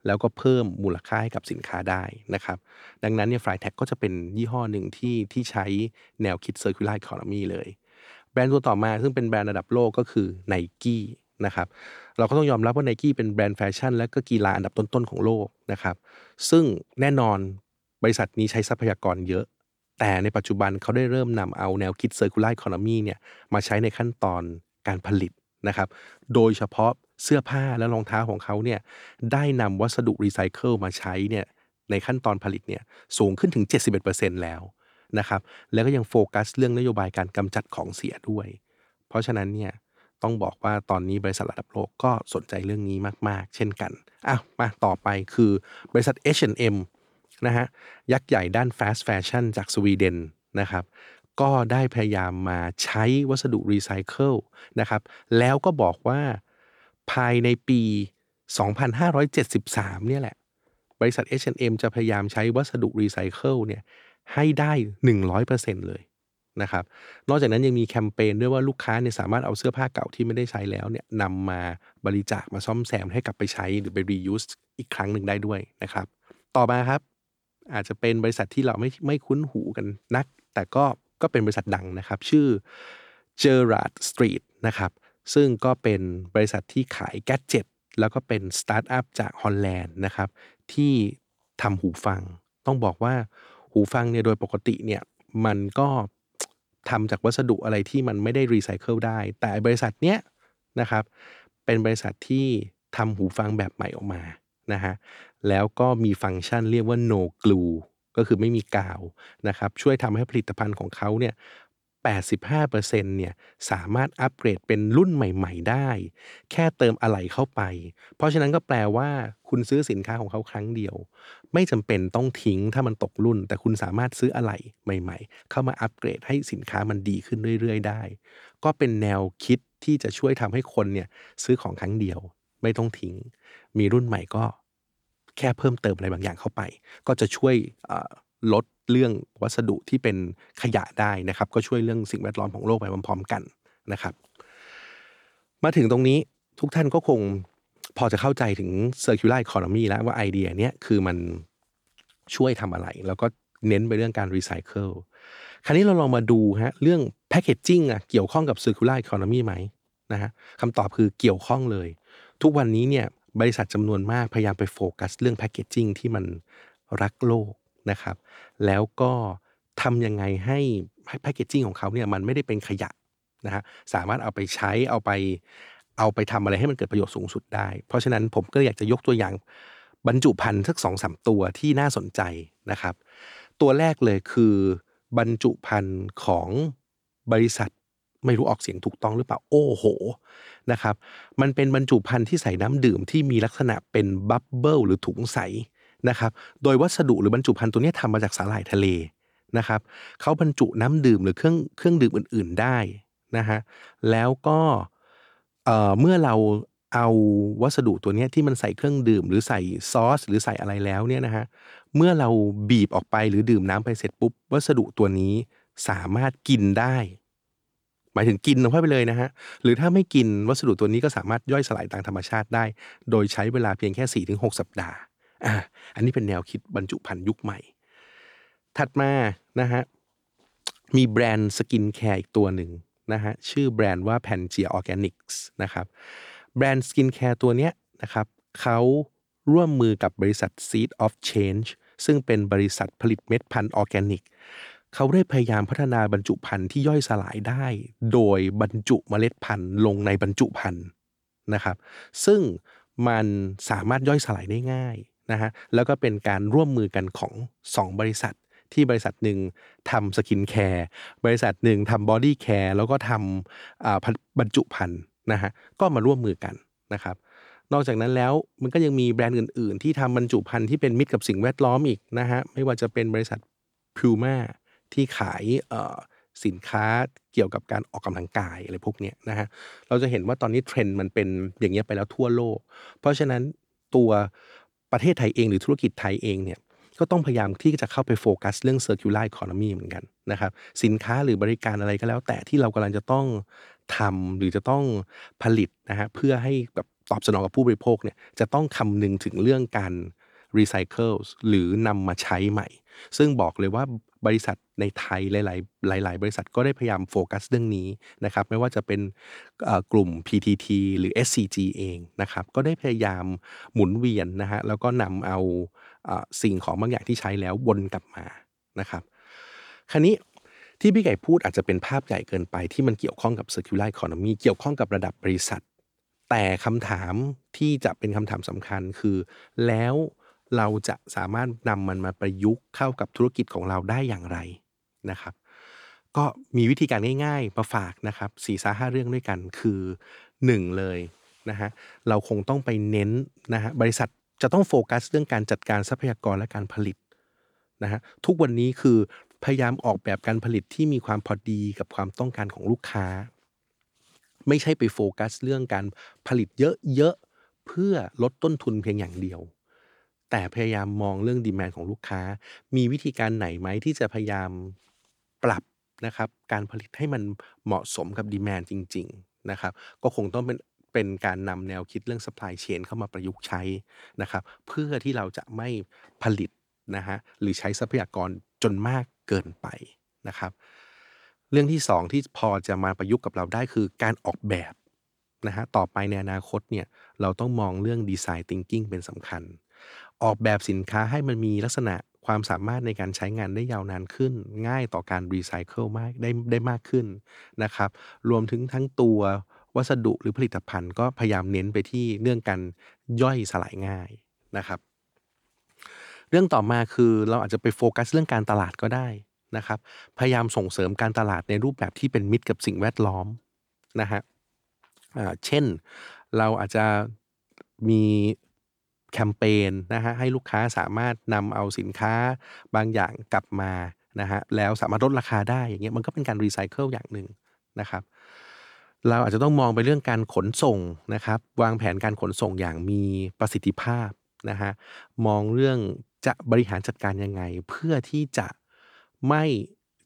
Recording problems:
none

